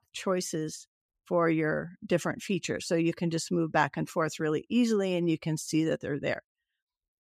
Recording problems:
none

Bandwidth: 14.5 kHz